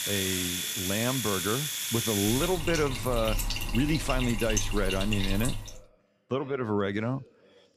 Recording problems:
household noises; loud; until 5.5 s; 1 dB below the speech
voice in the background; faint; throughout; 25 dB below the speech

